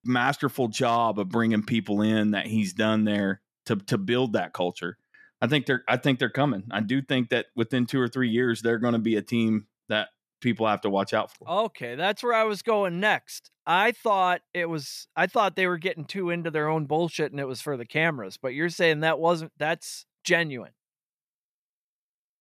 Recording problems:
none

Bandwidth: 14.5 kHz